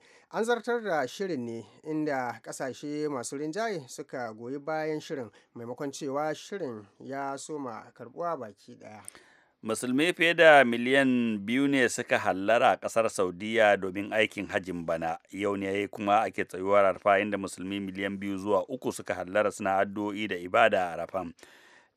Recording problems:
none

